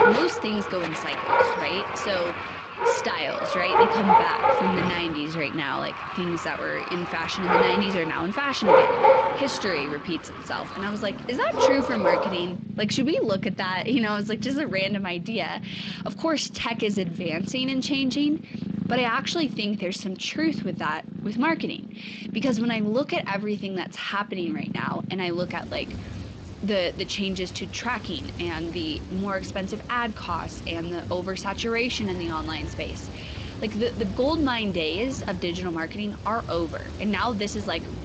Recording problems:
garbled, watery; slightly; nothing above 7.5 kHz
animal sounds; loud; throughout; 1 dB below the speech

